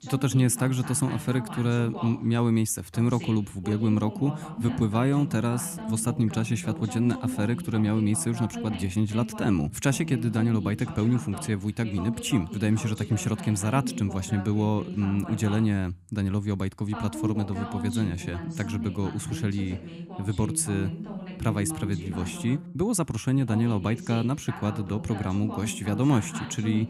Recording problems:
voice in the background; loud; throughout; 9 dB below the speech

